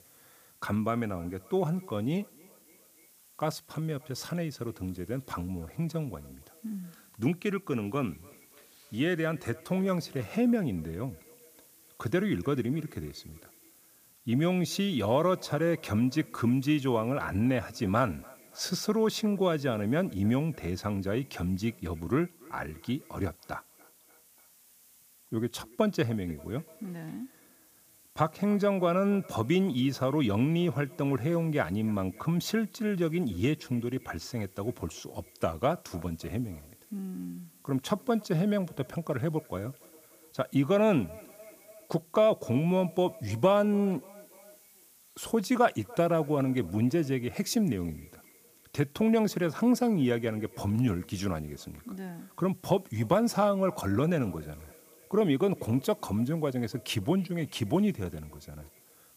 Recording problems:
echo of what is said; faint; throughout; 290 ms later, 25 dB below the speech
hiss; faint; throughout; 25 dB below the speech

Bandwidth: 15 kHz